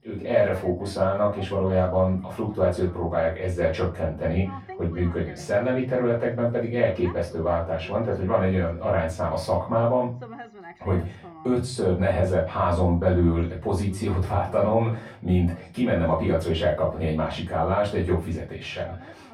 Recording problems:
off-mic speech; far
muffled; very; fading above 3.5 kHz
room echo; slight; dies away in 0.3 s
voice in the background; faint; throughout; 20 dB below the speech

